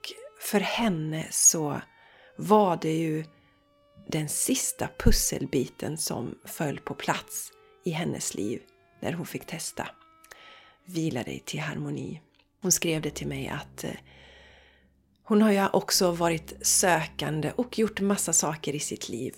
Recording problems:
background music; faint; throughout; 30 dB below the speech

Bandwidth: 16 kHz